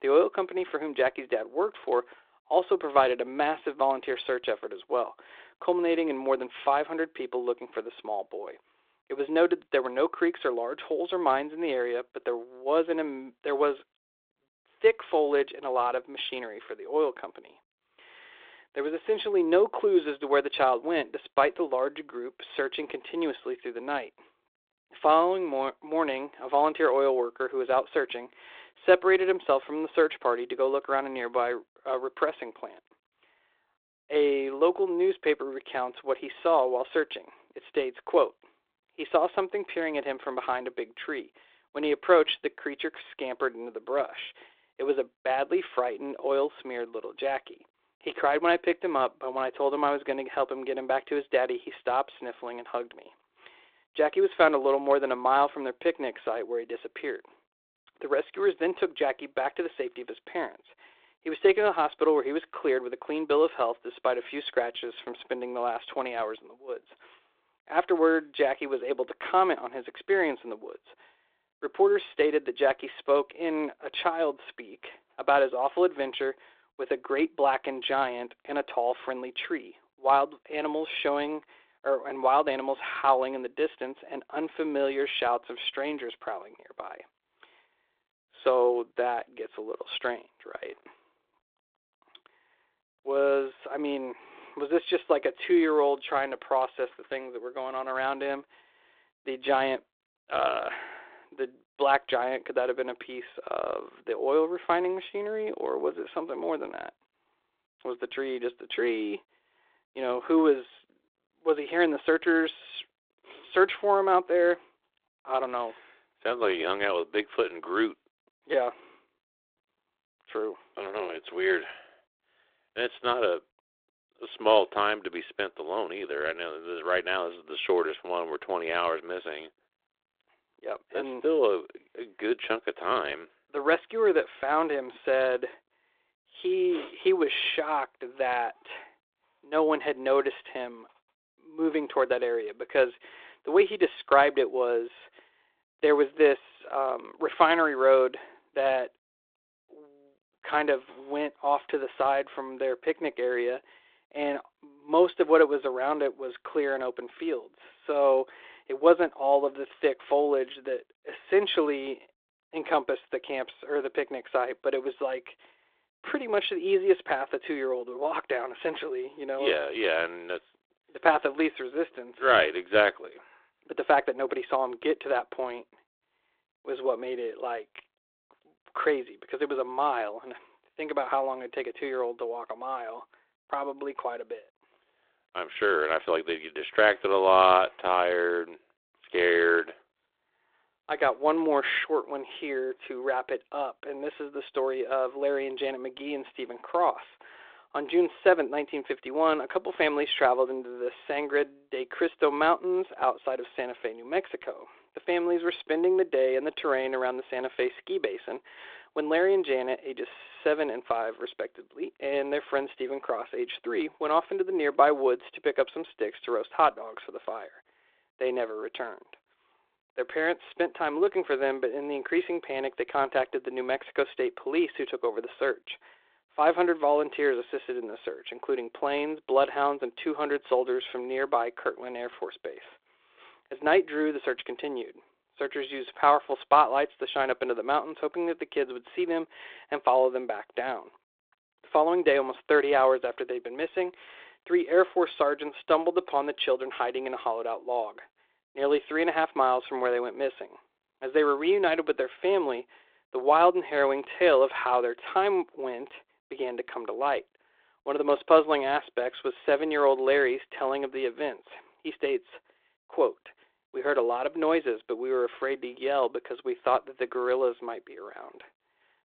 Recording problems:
phone-call audio

